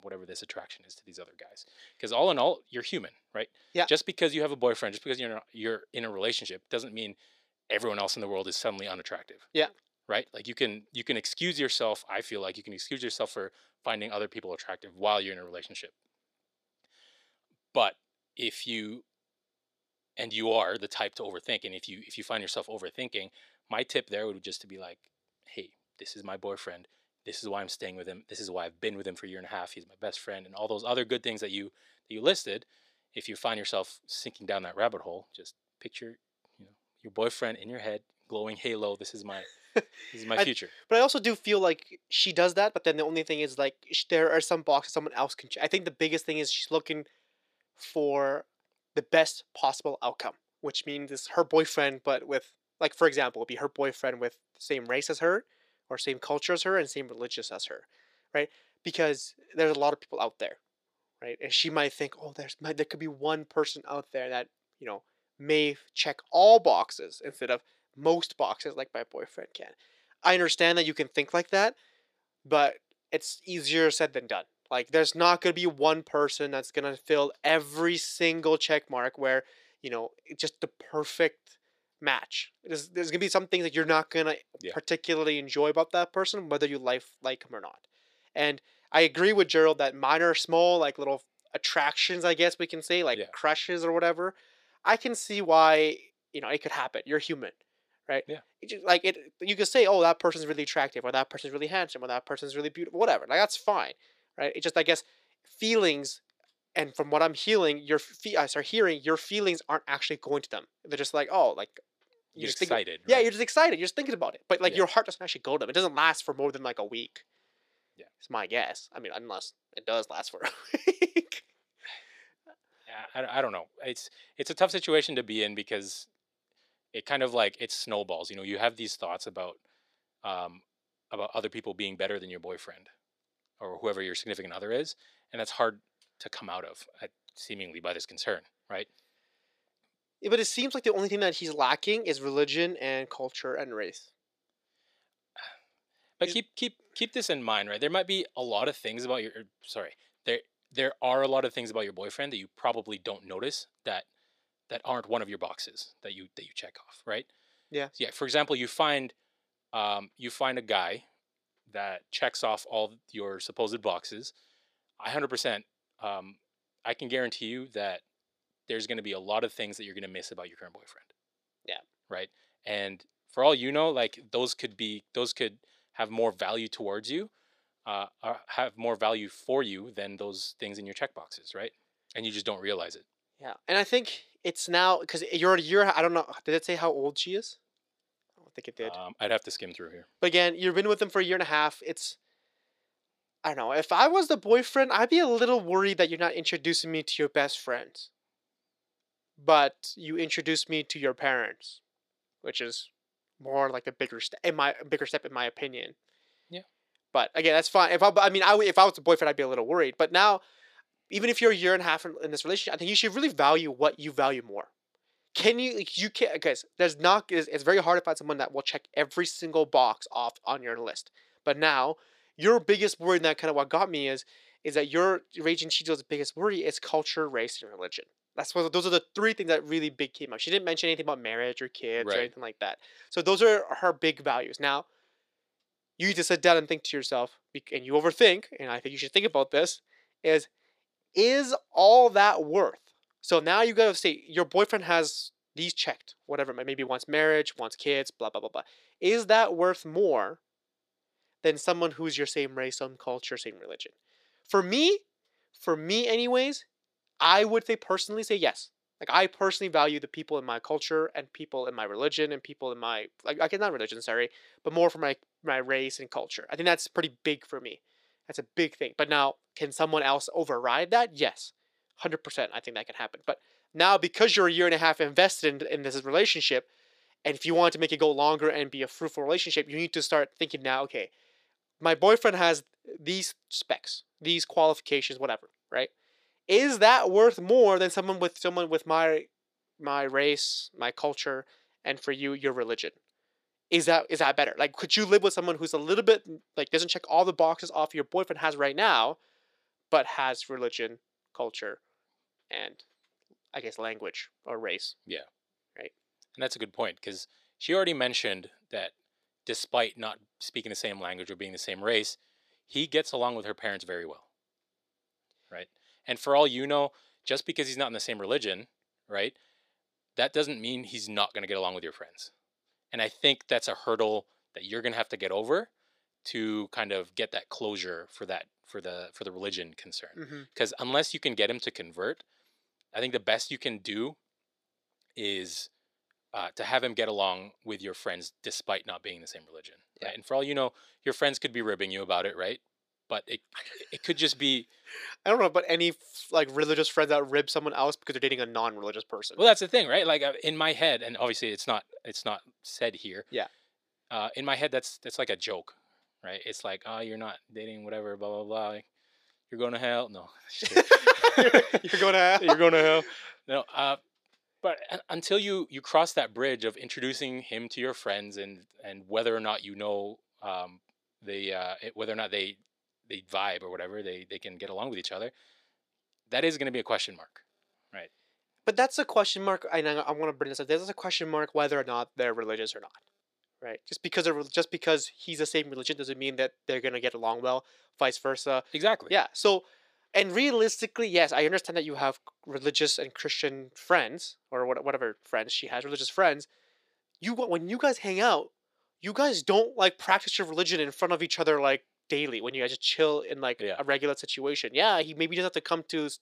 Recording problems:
thin; somewhat; fading below 400 Hz

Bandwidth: 14.5 kHz